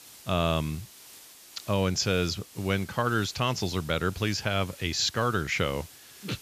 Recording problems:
high frequencies cut off; noticeable; nothing above 8 kHz
hiss; noticeable; throughout; 20 dB below the speech

